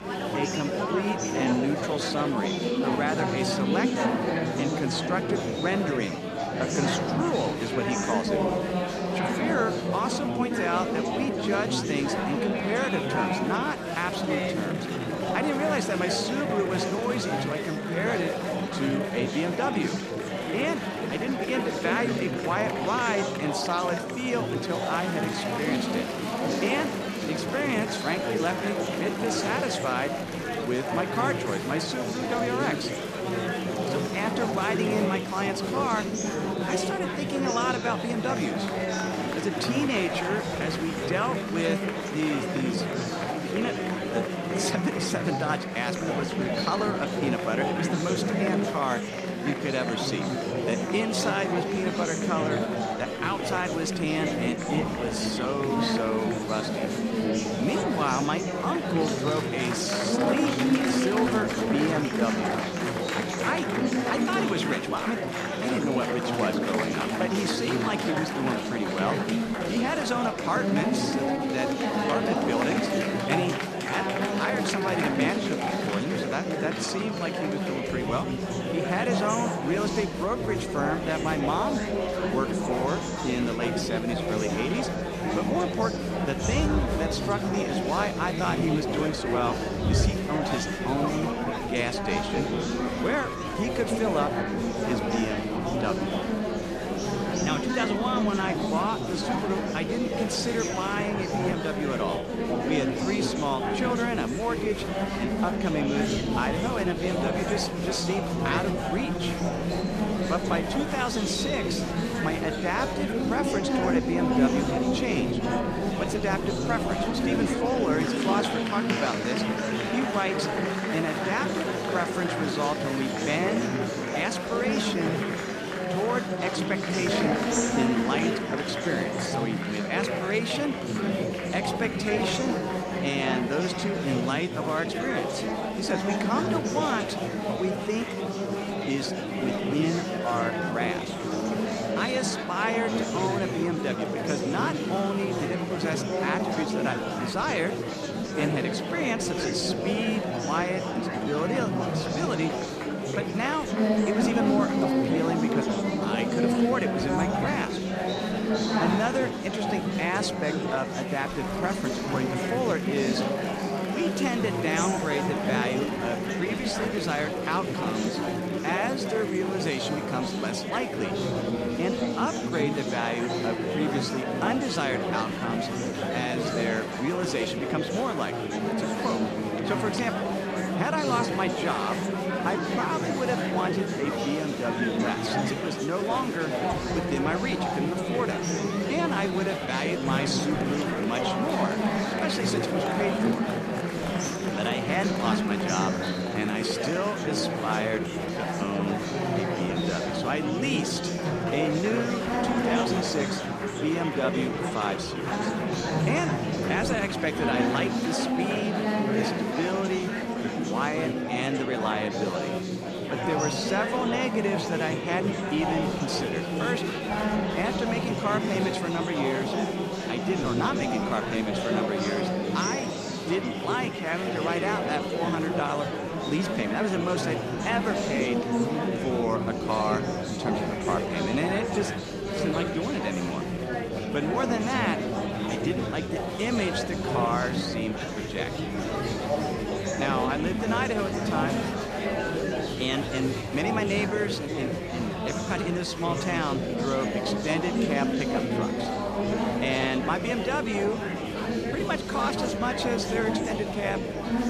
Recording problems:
murmuring crowd; very loud; throughout; 2 dB above the speech

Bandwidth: 14 kHz